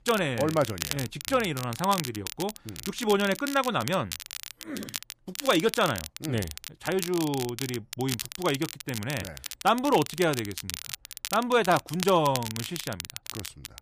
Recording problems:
crackle, like an old record; loud; 9 dB below the speech

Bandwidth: 15 kHz